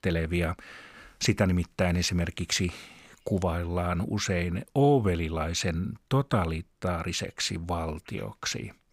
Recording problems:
none

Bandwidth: 15.5 kHz